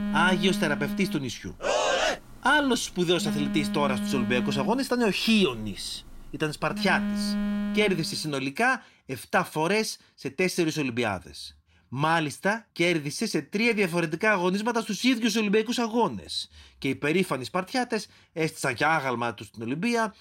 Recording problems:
alarms or sirens; loud; until 8 s; 5 dB below the speech

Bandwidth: 16 kHz